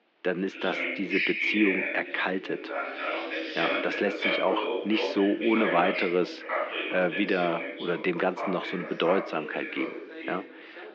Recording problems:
muffled; very; fading above 3 kHz
thin; somewhat; fading below 250 Hz
high frequencies cut off; slight; nothing above 8 kHz
background chatter; loud; throughout; 2 voices, 2 dB below the speech

